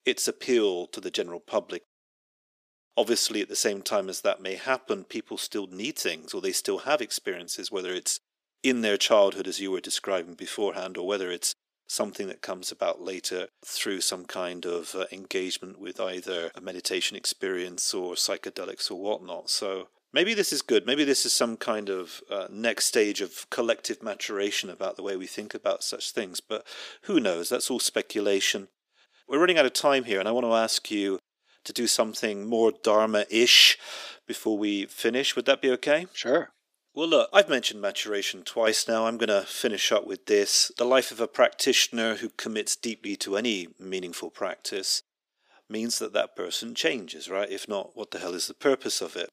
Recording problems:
thin; somewhat; fading below 300 Hz

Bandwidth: 15 kHz